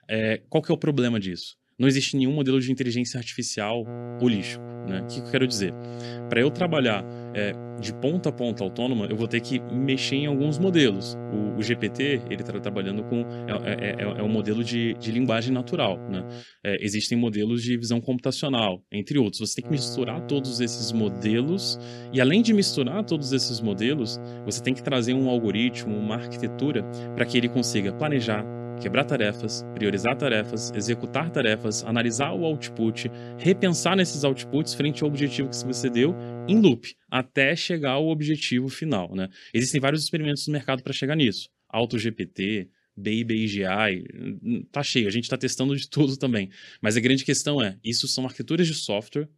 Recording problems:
electrical hum; noticeable; from 4 to 16 s and from 20 to 37 s; 60 Hz, 15 dB below the speech

